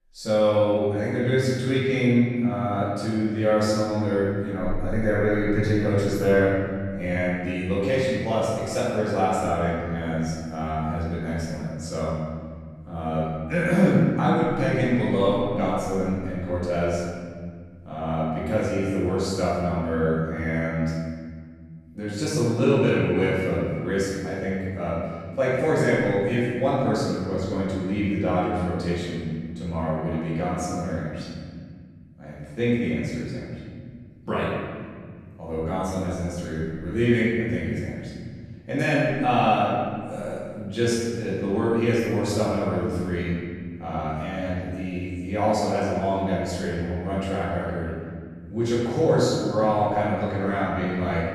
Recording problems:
room echo; strong; dies away in 2.3 s
off-mic speech; far

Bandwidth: 13.5 kHz